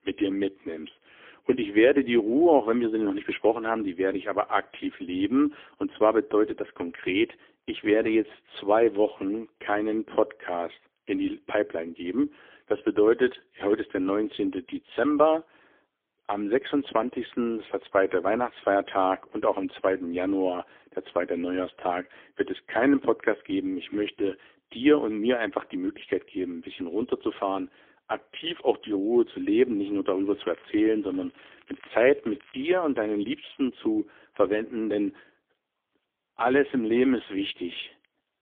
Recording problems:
phone-call audio; poor line; nothing above 3.5 kHz
crackling; faint; from 30 to 33 s; 30 dB below the speech

